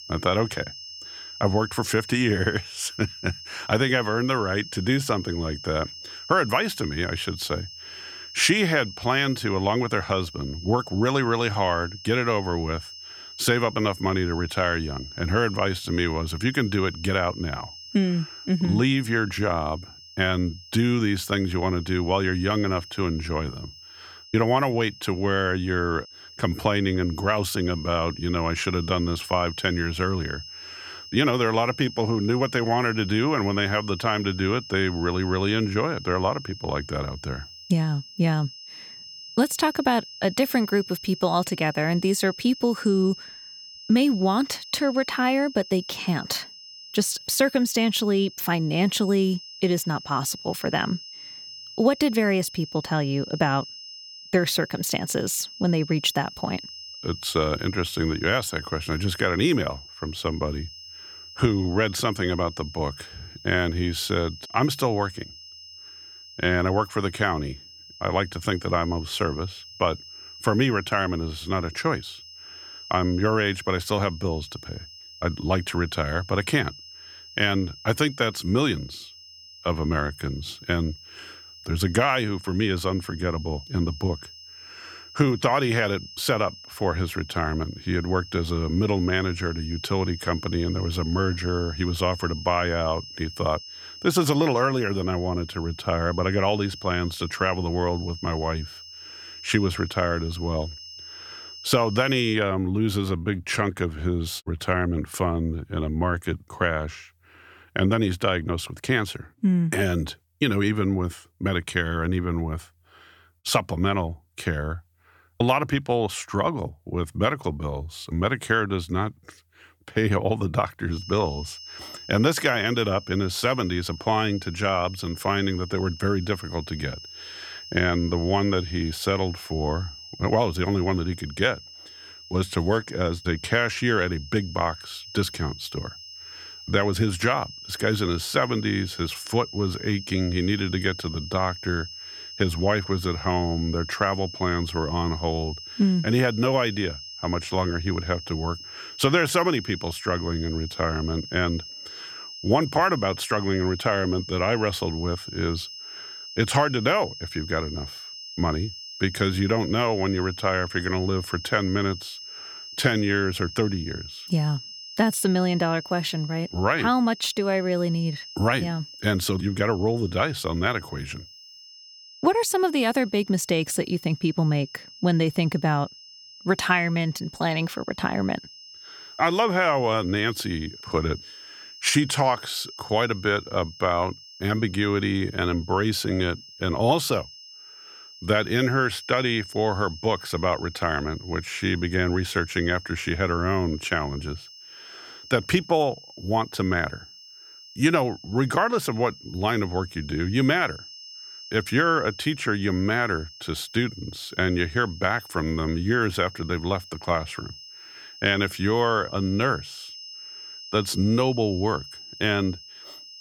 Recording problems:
high-pitched whine; noticeable; until 1:42 and from 2:01 on; 5 kHz, 15 dB below the speech

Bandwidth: 18.5 kHz